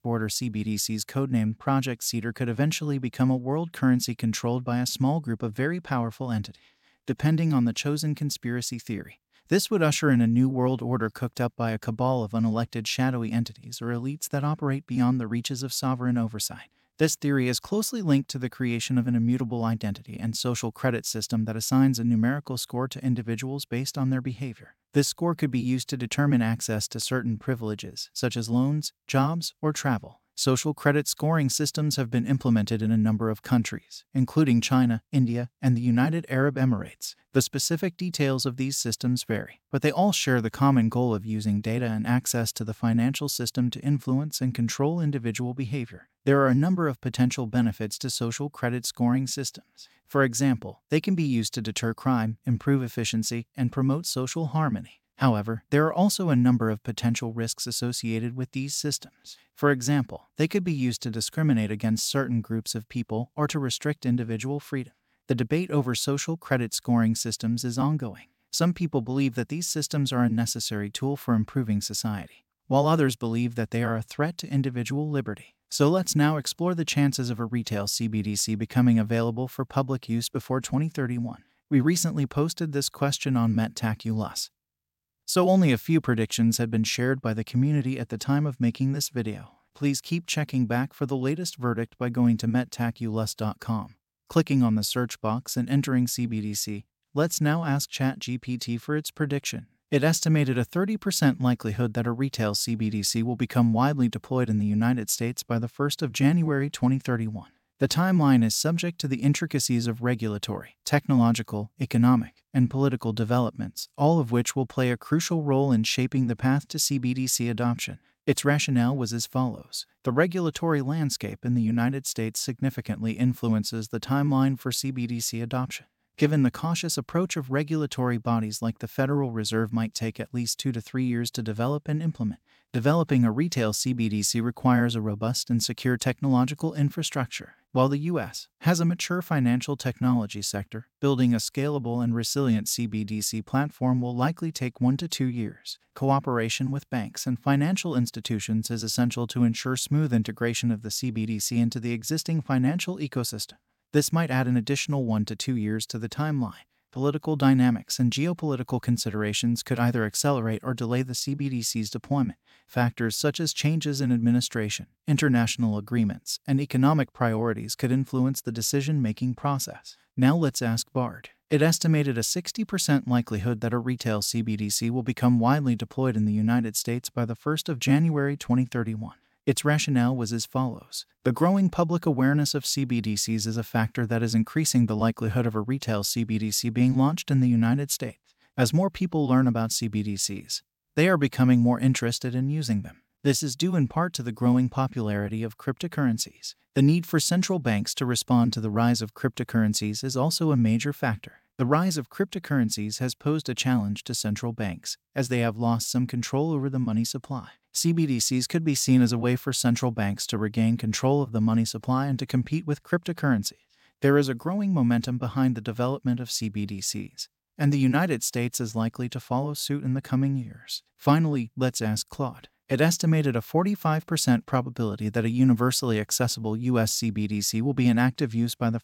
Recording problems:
none

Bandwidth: 16.5 kHz